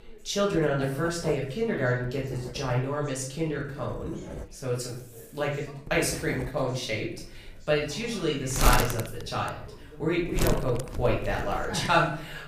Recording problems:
off-mic speech; far
room echo; noticeable; dies away in 0.5 s
household noises; loud; throughout; 6 dB below the speech
background chatter; faint; throughout; 3 voices, 20 dB below the speech

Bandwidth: 15 kHz